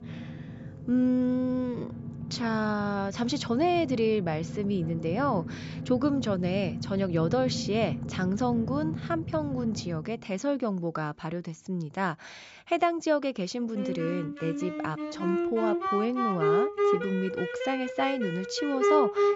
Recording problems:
high frequencies cut off; noticeable; nothing above 8 kHz
background music; loud; throughout; 3 dB below the speech

